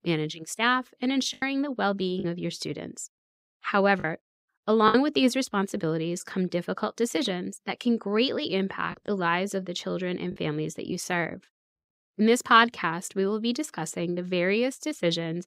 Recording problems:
choppy; occasionally; 2% of the speech affected

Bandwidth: 15.5 kHz